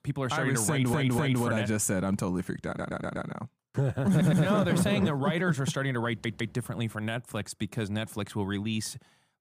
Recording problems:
audio stuttering; 4 times, first at 0.5 s

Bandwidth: 15 kHz